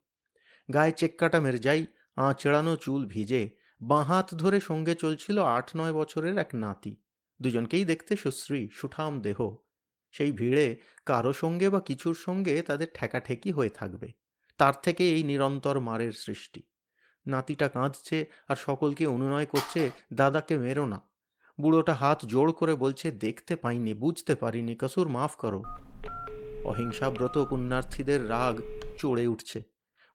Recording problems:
garbled, watery; slightly; nothing above 16.5 kHz
phone ringing; noticeable; at 20 s; peak 7 dB below the speech
phone ringing; faint; from 26 to 29 s; peak 10 dB below the speech

